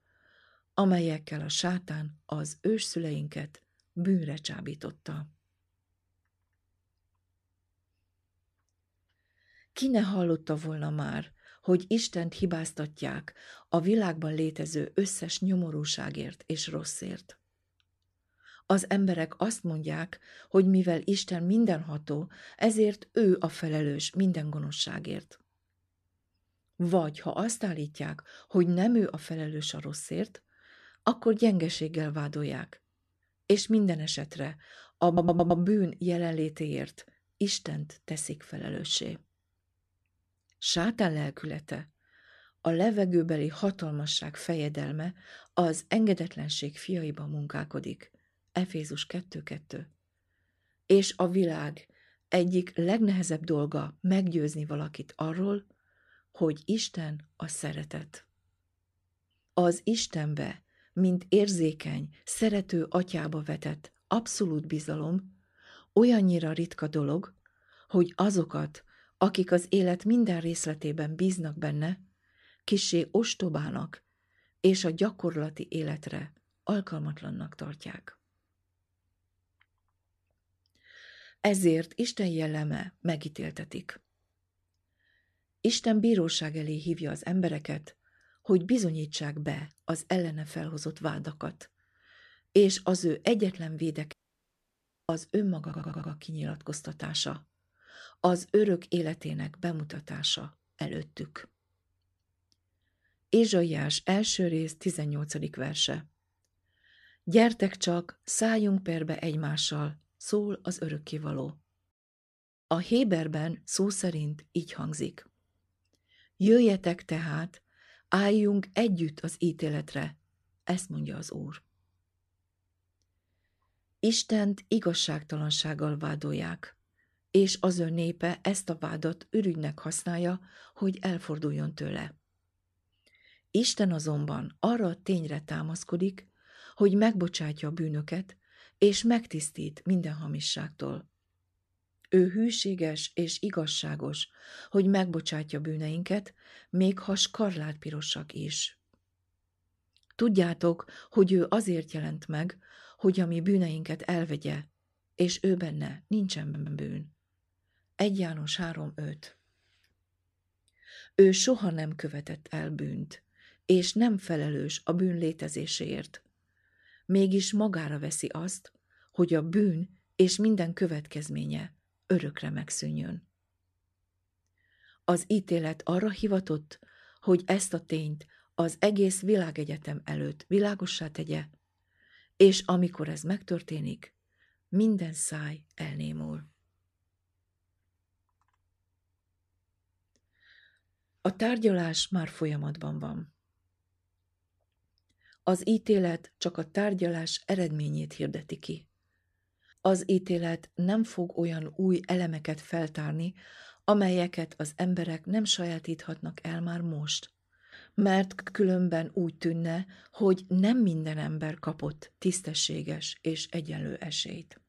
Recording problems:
audio stuttering; 4 times, first at 35 s
audio cutting out; at 1:34 for 1 s

